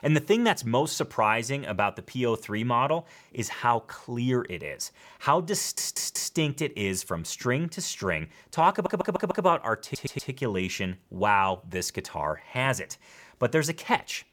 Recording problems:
audio stuttering; at 5.5 s, at 8.5 s and at 10 s

